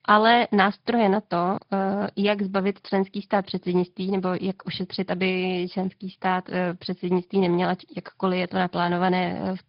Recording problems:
high frequencies cut off; noticeable; nothing above 5 kHz
garbled, watery; slightly

